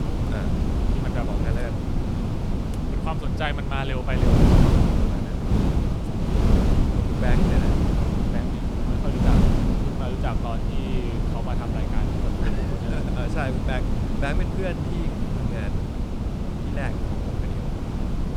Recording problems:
wind noise on the microphone; heavy; 2 dB above the speech

